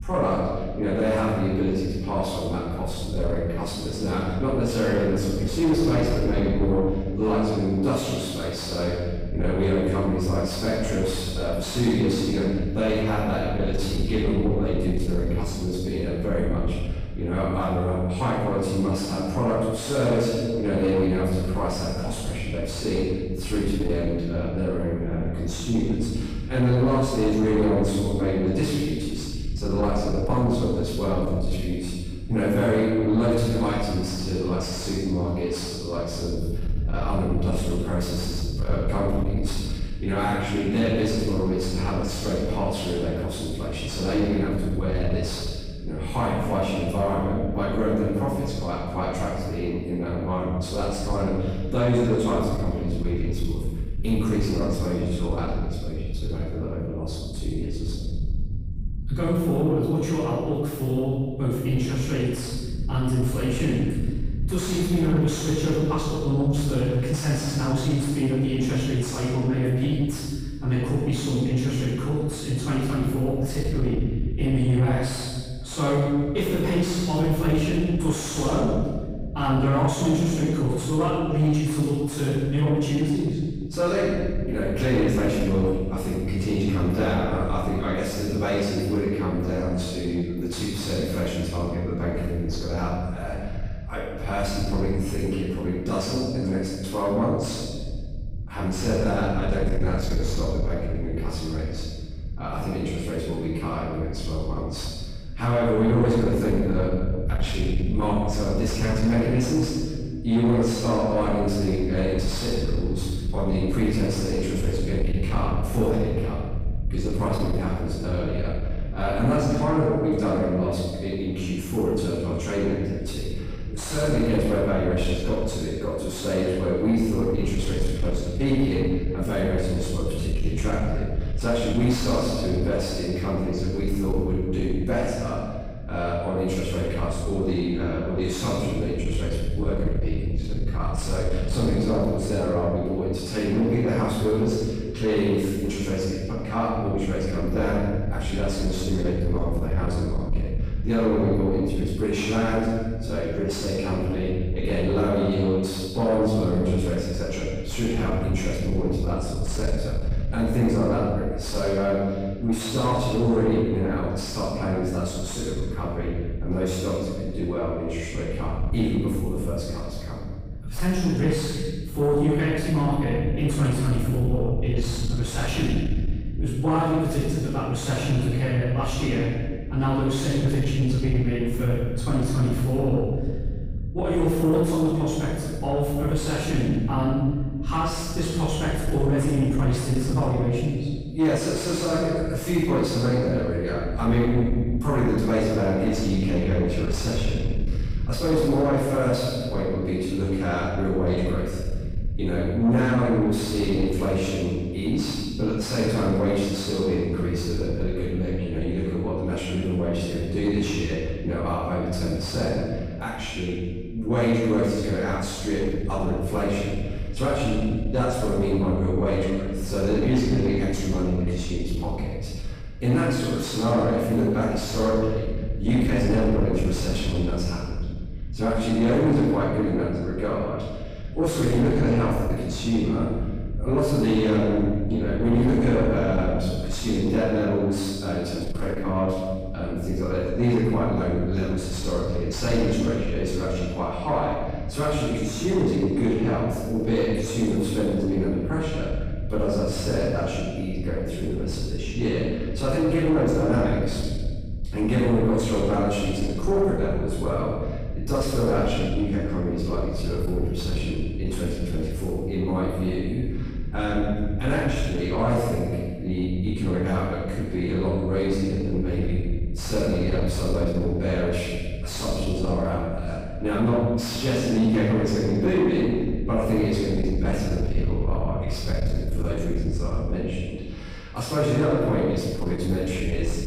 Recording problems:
room echo; strong; dies away in 1.2 s
off-mic speech; far
distortion; slight; 10 dB below the speech
low rumble; noticeable; throughout; 20 dB below the speech

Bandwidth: 15.5 kHz